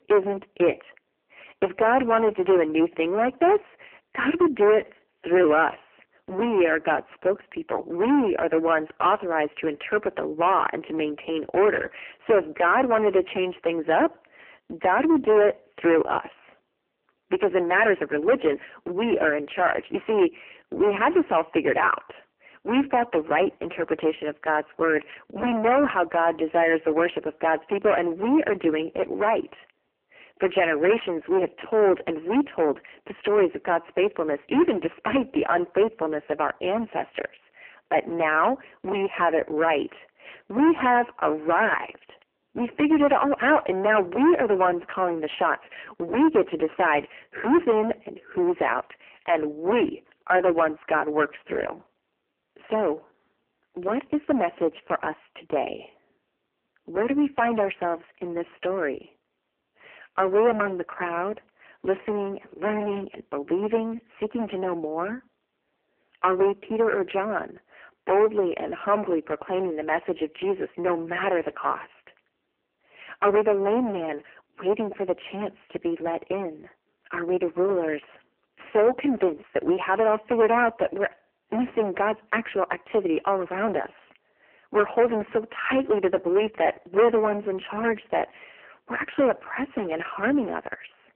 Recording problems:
phone-call audio; poor line
distortion; heavy; 11% of the sound clipped

